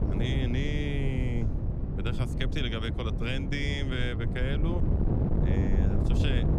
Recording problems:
wind noise on the microphone; heavy; 4 dB below the speech
background chatter; faint; throughout; 4 voices, 30 dB below the speech

